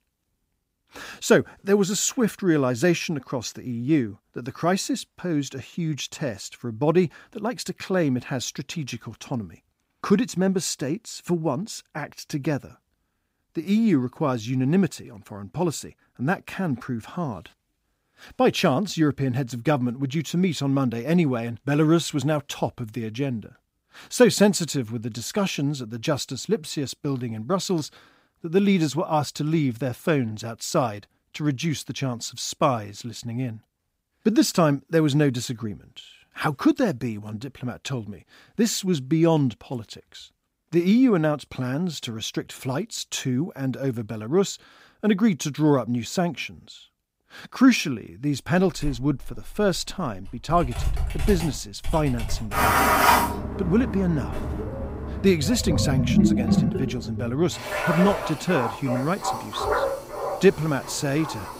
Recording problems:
household noises; loud; from 49 s on; 1 dB below the speech

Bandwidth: 15.5 kHz